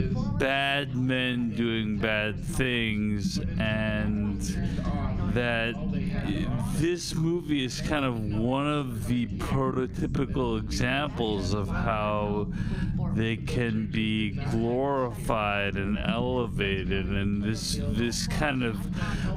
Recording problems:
wrong speed, natural pitch; too slow; 0.5 times normal speed
squashed, flat; somewhat, background pumping
background chatter; noticeable; throughout; 2 voices, 15 dB below the speech
low rumble; noticeable; throughout; 15 dB below the speech

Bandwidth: 15.5 kHz